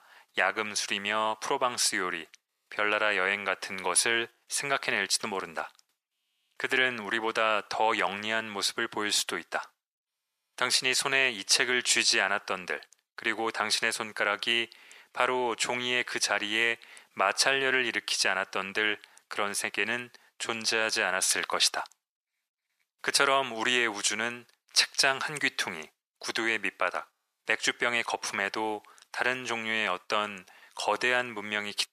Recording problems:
thin; very; fading below 850 Hz

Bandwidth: 14.5 kHz